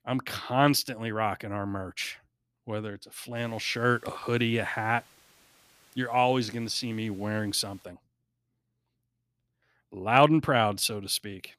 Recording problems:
hiss; faint; from 3.5 to 8 s; 30 dB below the speech

